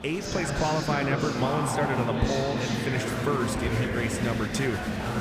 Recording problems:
murmuring crowd; very loud; throughout; as loud as the speech

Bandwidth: 15 kHz